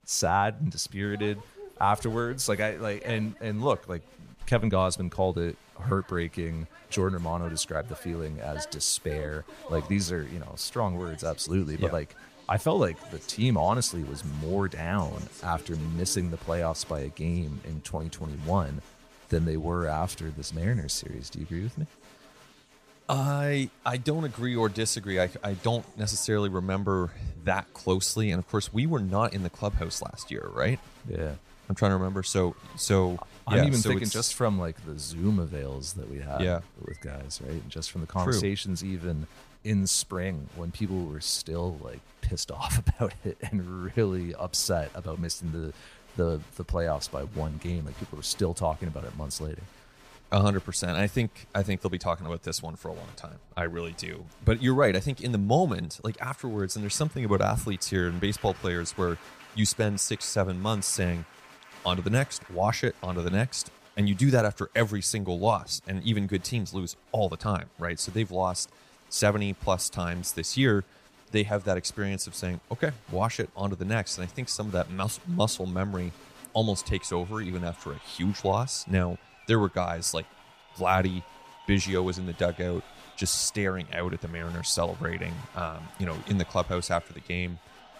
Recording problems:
crowd noise; faint; throughout; 20 dB below the speech

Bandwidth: 15 kHz